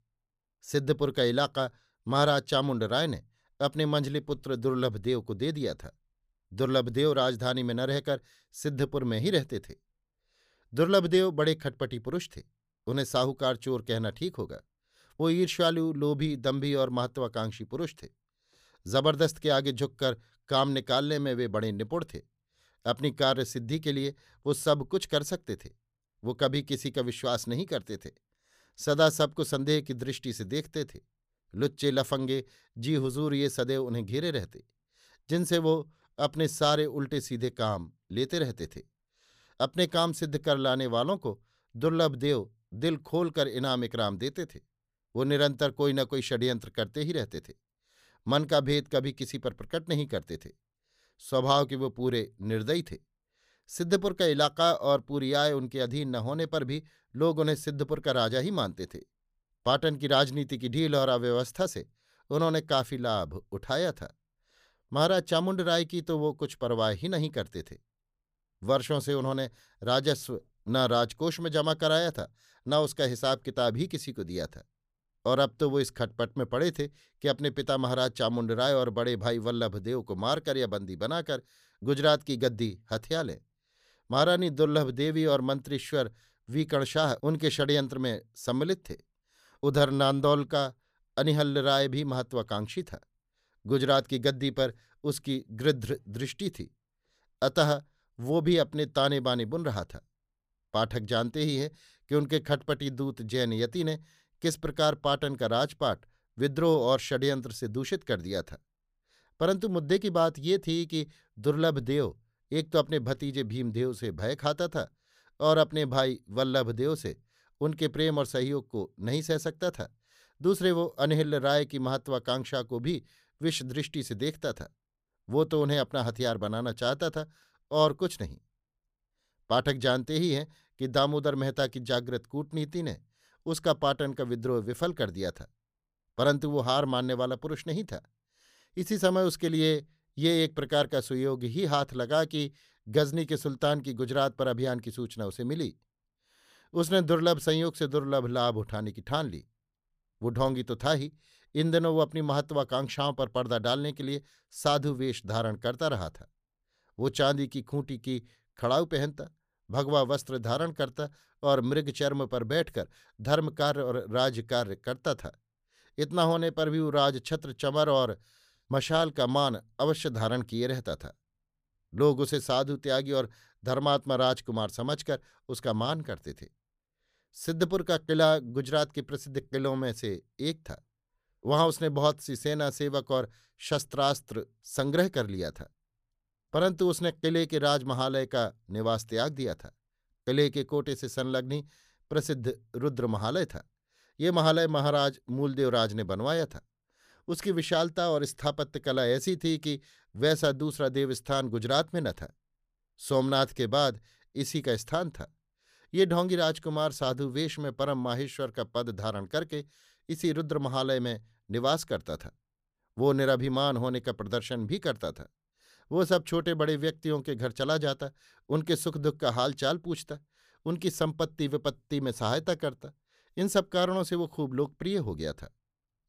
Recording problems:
none

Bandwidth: 15 kHz